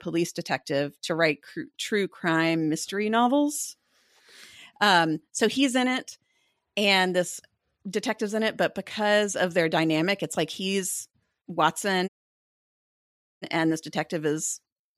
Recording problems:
audio cutting out; at 12 s for 1.5 s

